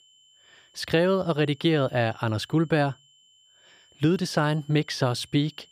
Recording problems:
high-pitched whine; faint; throughout; 3 kHz, 30 dB below the speech

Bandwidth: 15 kHz